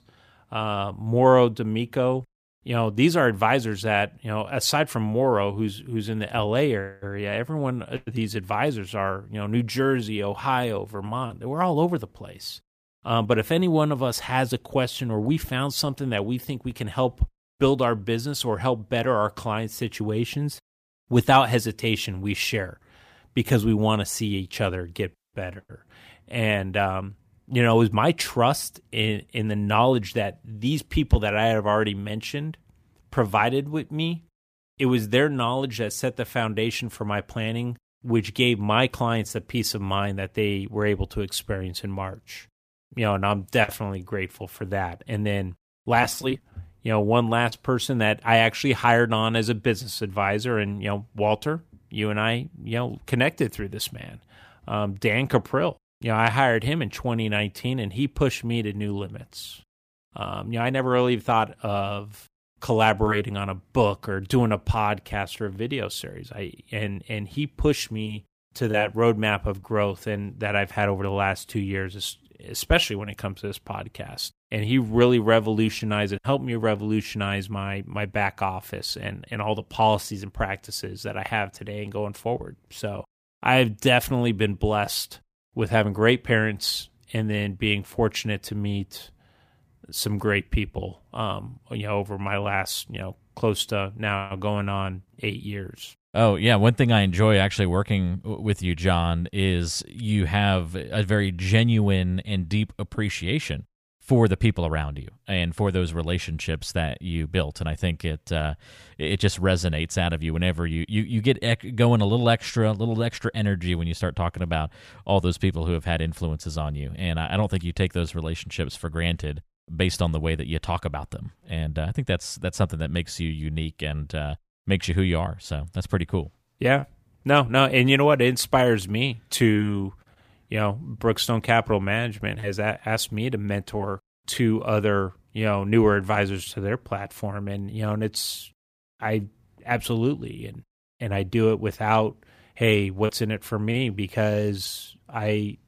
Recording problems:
none

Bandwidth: 15 kHz